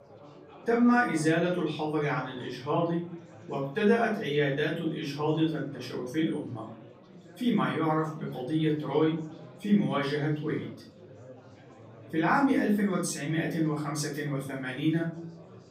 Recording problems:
off-mic speech; far
room echo; slight; dies away in 0.5 s
chatter from many people; faint; throughout; 20 dB below the speech

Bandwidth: 15.5 kHz